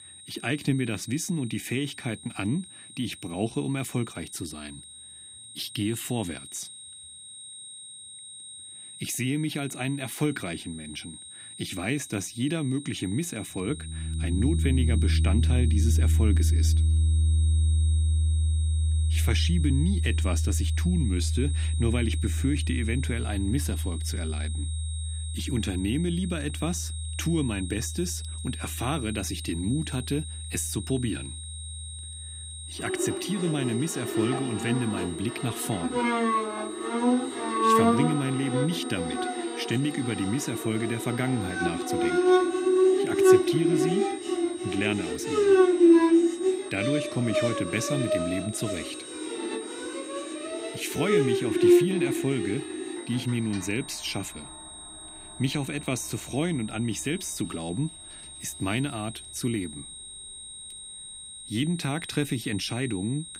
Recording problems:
background music; very loud; from 14 s on; 4 dB above the speech
high-pitched whine; noticeable; throughout; 8.5 kHz, 10 dB below the speech

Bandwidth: 15.5 kHz